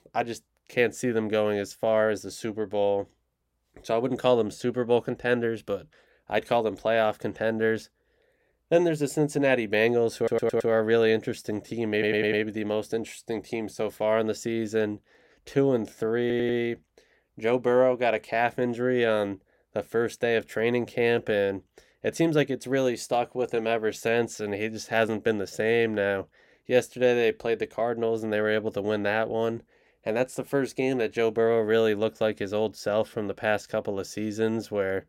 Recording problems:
audio stuttering; at 10 s, at 12 s and at 16 s

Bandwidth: 16 kHz